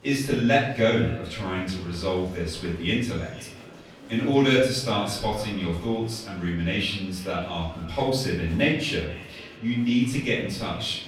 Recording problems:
off-mic speech; far
room echo; noticeable; dies away in 0.6 s
echo of what is said; faint; throughout; 480 ms later, 20 dB below the speech
murmuring crowd; faint; throughout; 20 dB below the speech

